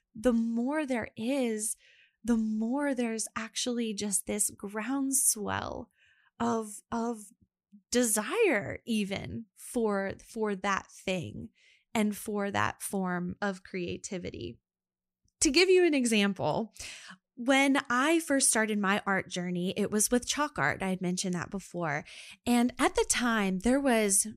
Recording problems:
none

